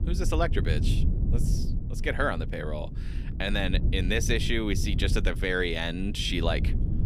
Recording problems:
low rumble; noticeable; throughout; 15 dB below the speech

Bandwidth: 14.5 kHz